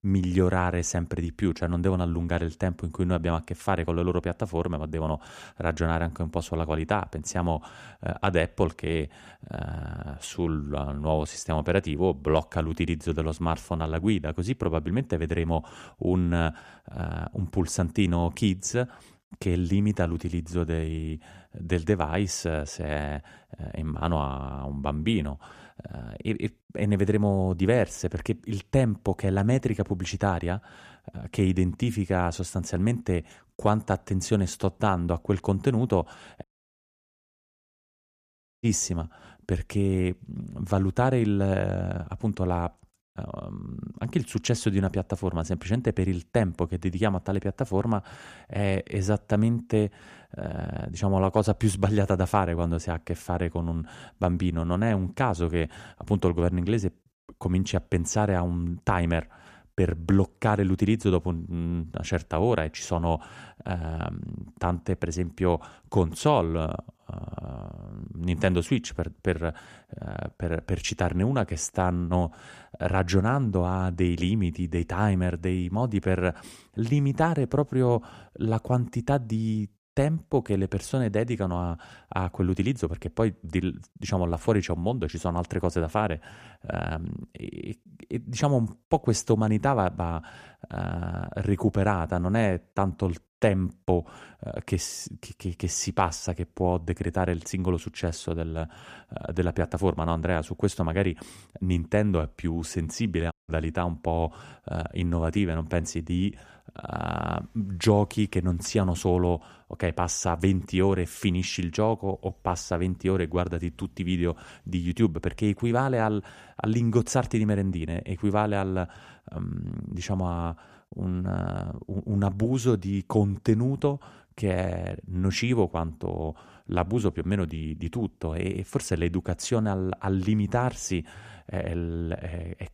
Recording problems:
audio cutting out; at 36 s for 2 s and at 1:43

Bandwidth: 14.5 kHz